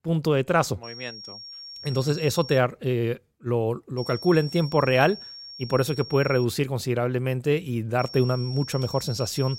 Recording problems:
high-pitched whine; noticeable; from 1 to 2.5 s, from 4 to 6.5 s and from 8 s on; 5.5 kHz, 15 dB below the speech

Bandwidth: 16 kHz